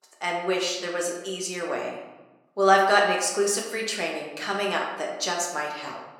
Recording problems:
room echo; noticeable; dies away in 0.9 s
thin; somewhat; fading below 450 Hz
off-mic speech; somewhat distant

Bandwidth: 17 kHz